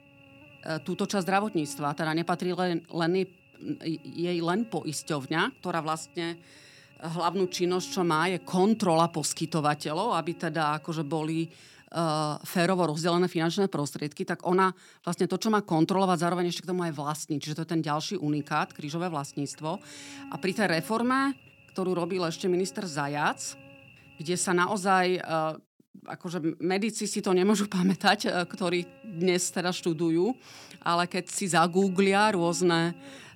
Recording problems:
electrical hum; faint; until 12 s, from 18 to 25 s and from 27 s on; 50 Hz, 25 dB below the speech

